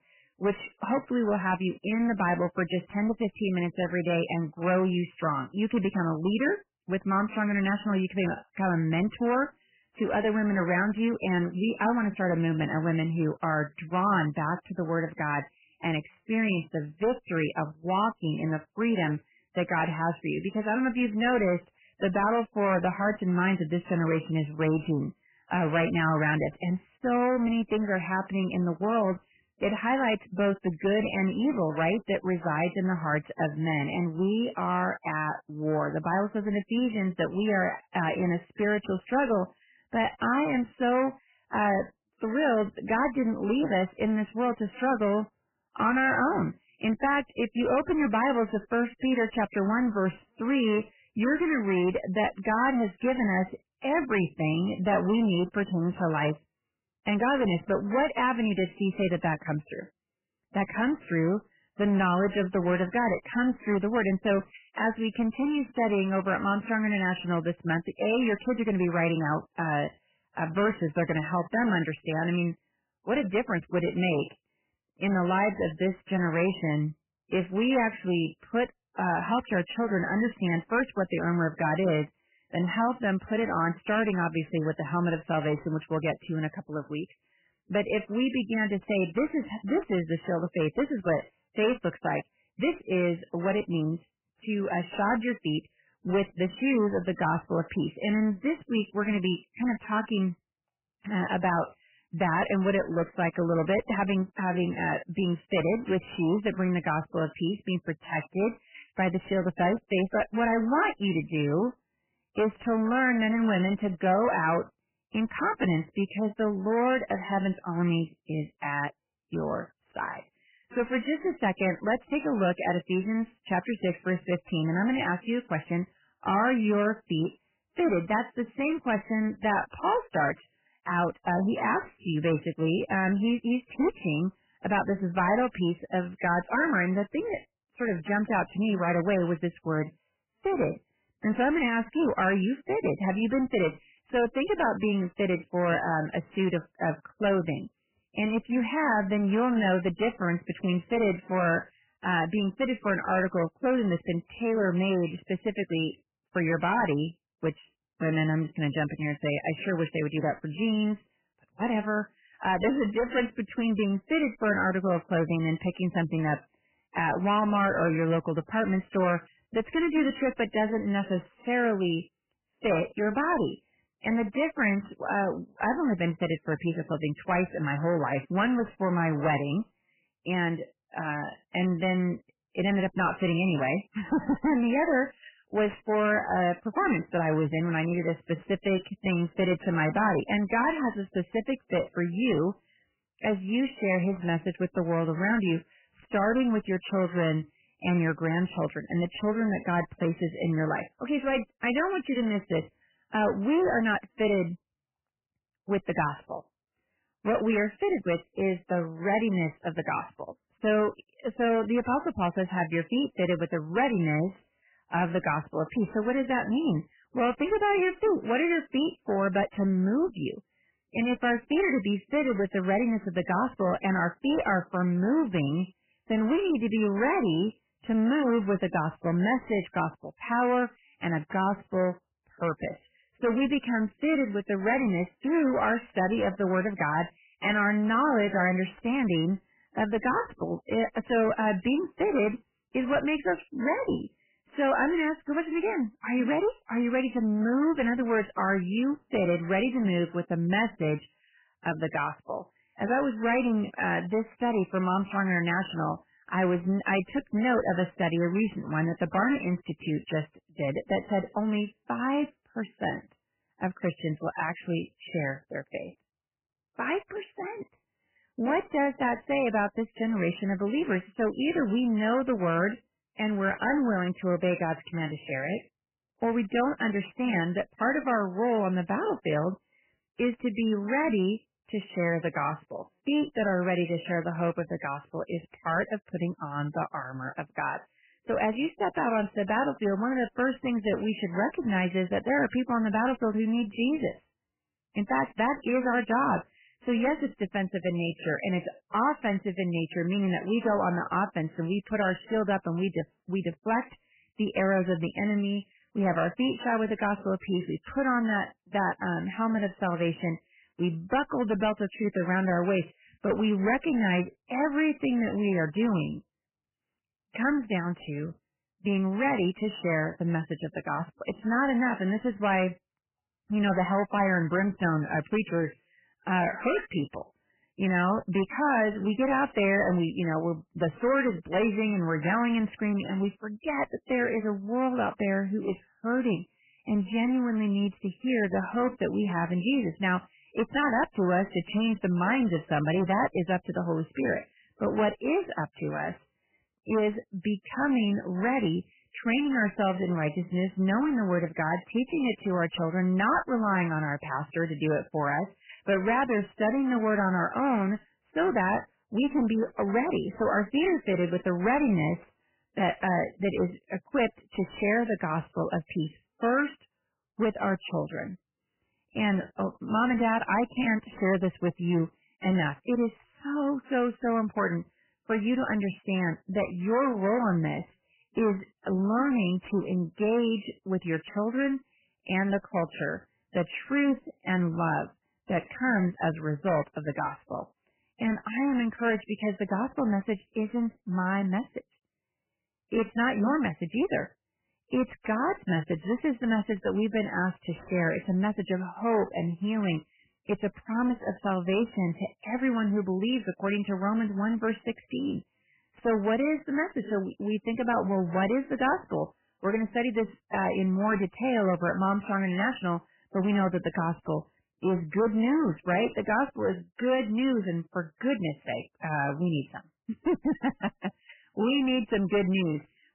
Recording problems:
garbled, watery; badly; nothing above 3 kHz
distortion; slight; 11% of the sound clipped

